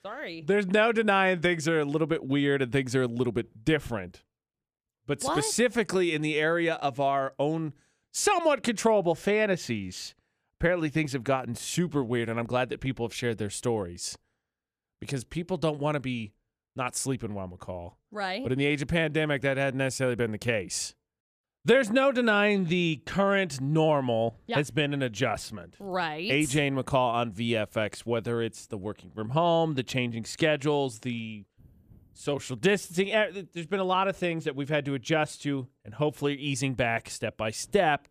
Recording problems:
none

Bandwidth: 14.5 kHz